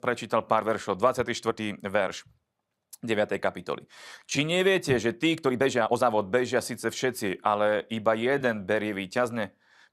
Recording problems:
uneven, jittery; strongly; from 1.5 to 8.5 s

